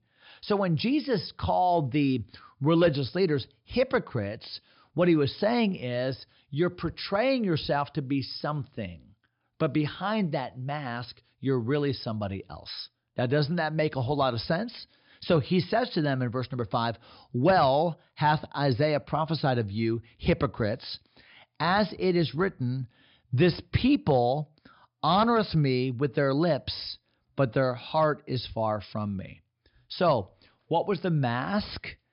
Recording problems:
high frequencies cut off; noticeable; nothing above 5.5 kHz

